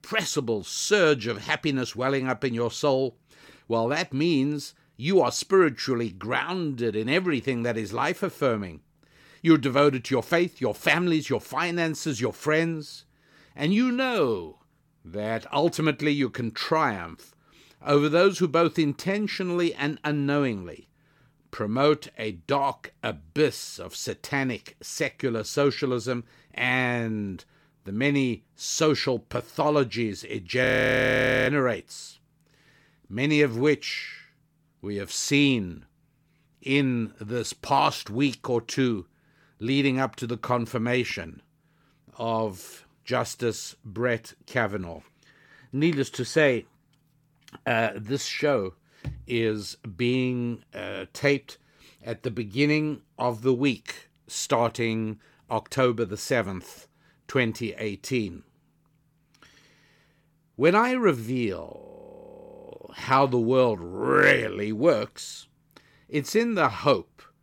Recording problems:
audio freezing; at 31 s for 1 s and at 1:02 for 1 s

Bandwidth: 17.5 kHz